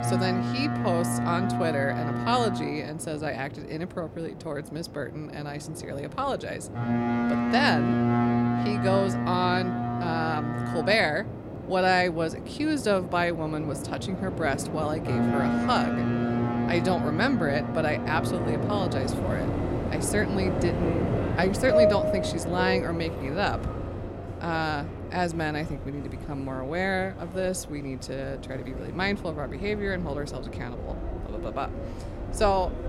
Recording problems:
train or aircraft noise; loud; throughout; as loud as the speech

